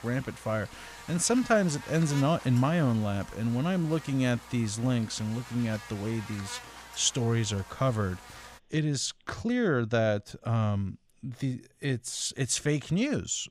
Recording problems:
electrical hum; noticeable; until 8.5 s; 60 Hz, 15 dB below the speech

